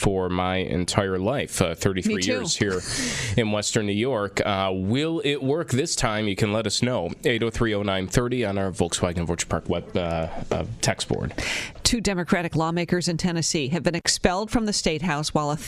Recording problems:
squashed, flat; heavily

